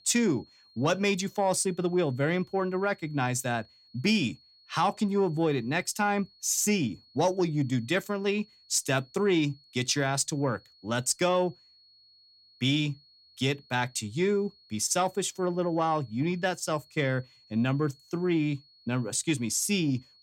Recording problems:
high-pitched whine; faint; throughout; 4.5 kHz, 30 dB below the speech

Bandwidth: 16.5 kHz